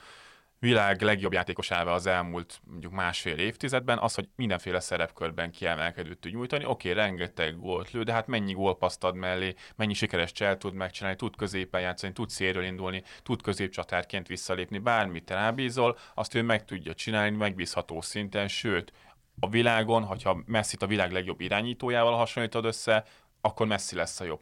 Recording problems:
uneven, jittery; strongly; from 1 to 24 s

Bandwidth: 17.5 kHz